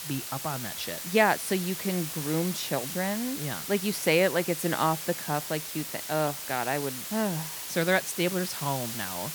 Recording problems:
hiss; loud; throughout; 5 dB below the speech

